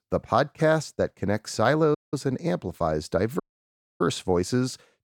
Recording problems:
audio cutting out; at 2 s and at 3.5 s for 0.5 s

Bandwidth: 17.5 kHz